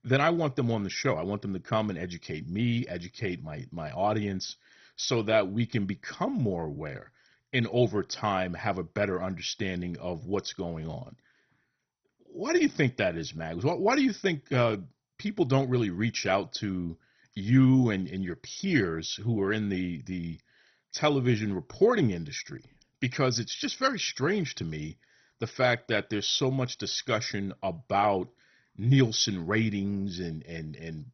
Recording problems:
garbled, watery; badly; nothing above 6 kHz

